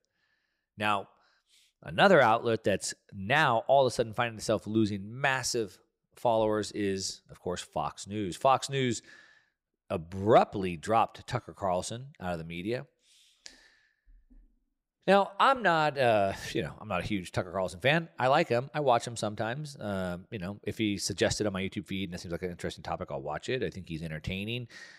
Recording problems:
none

